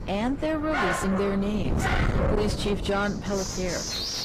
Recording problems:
distortion; heavy; 6 dB below the speech
garbled, watery; slightly
wind noise on the microphone; heavy; 6 dB below the speech
animal sounds; loud; throughout; 1 dB below the speech

